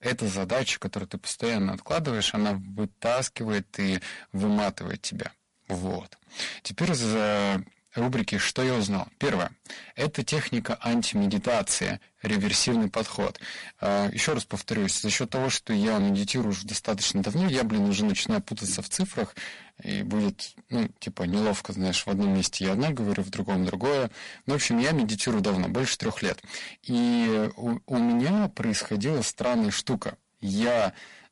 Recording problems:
distortion; heavy; 16% of the sound clipped
garbled, watery; slightly; nothing above 11 kHz

